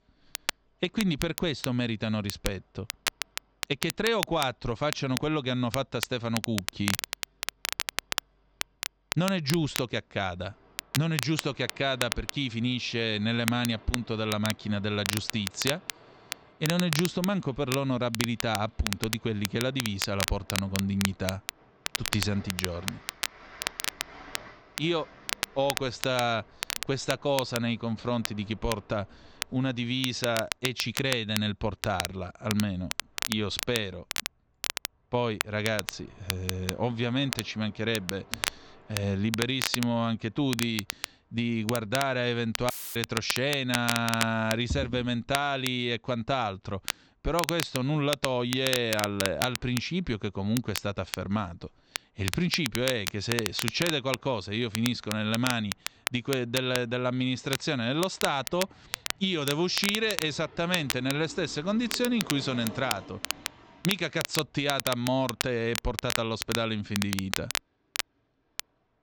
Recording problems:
high frequencies cut off; noticeable; nothing above 8 kHz
crackle, like an old record; loud; 5 dB below the speech
train or aircraft noise; faint; throughout; 25 dB below the speech
audio cutting out; filled with static; at 43 s

